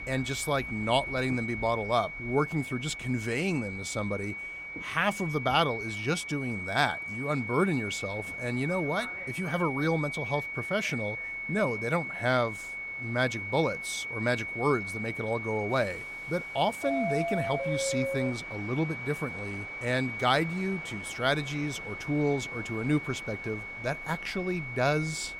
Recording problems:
high-pitched whine; loud; throughout; 2 kHz, 6 dB below the speech
train or aircraft noise; noticeable; throughout; 15 dB below the speech

